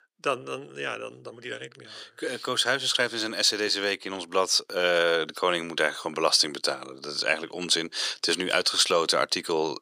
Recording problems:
thin; very; fading below 400 Hz

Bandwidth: 15 kHz